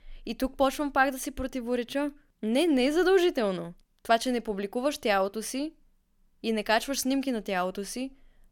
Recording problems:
none

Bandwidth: 17.5 kHz